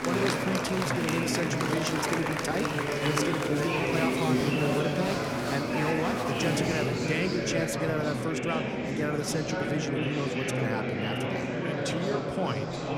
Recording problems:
murmuring crowd; very loud; throughout; 3 dB above the speech

